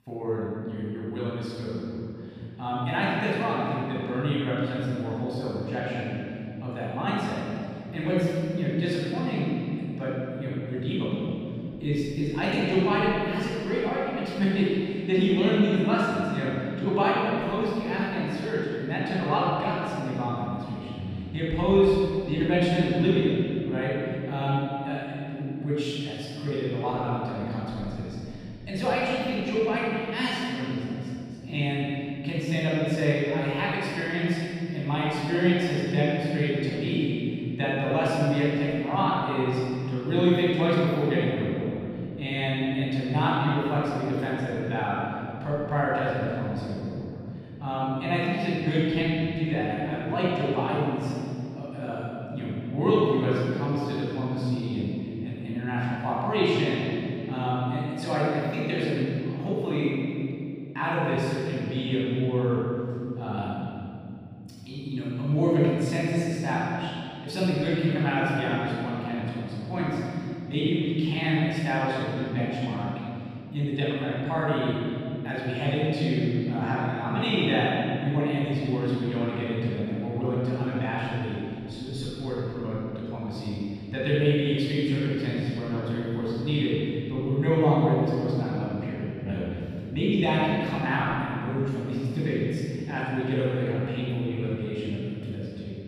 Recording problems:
room echo; strong; dies away in 3 s
off-mic speech; far

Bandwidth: 15 kHz